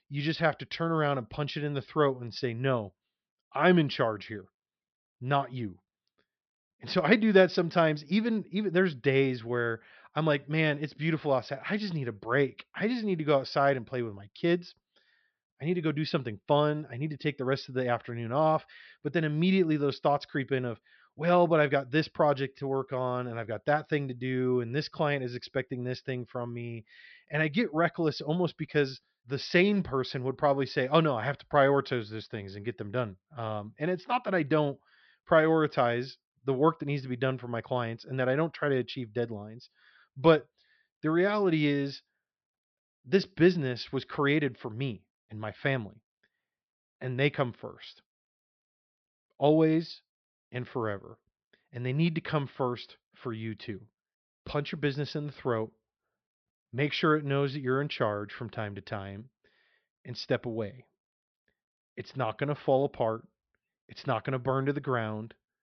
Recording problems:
high frequencies cut off; noticeable; nothing above 5.5 kHz

